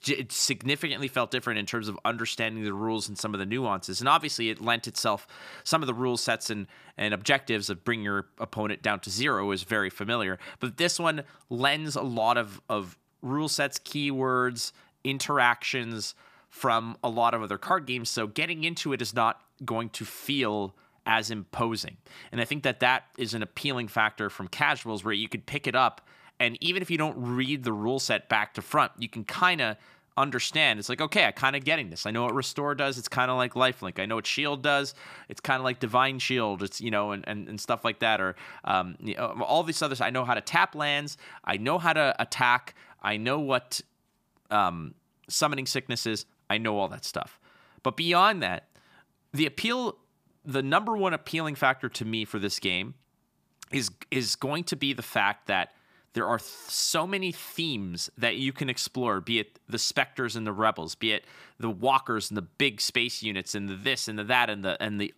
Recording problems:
none

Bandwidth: 15 kHz